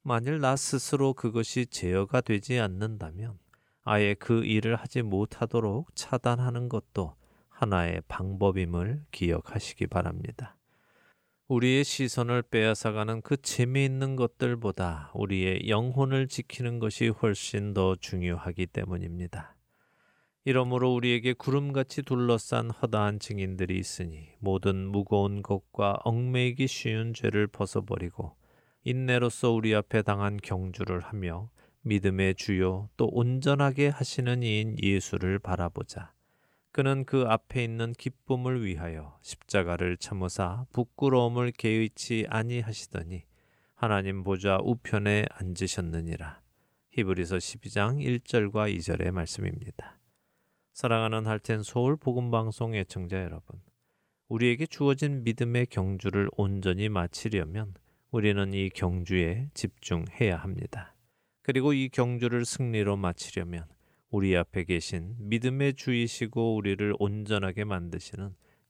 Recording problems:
none

